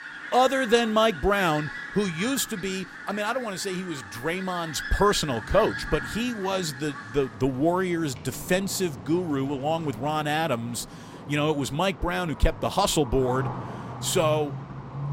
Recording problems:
animal sounds; noticeable; throughout; 10 dB below the speech

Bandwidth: 16 kHz